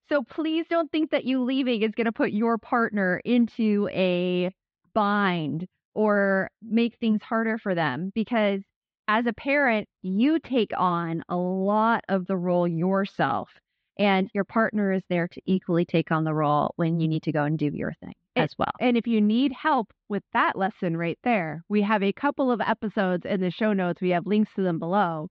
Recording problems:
muffled; slightly; fading above 4 kHz

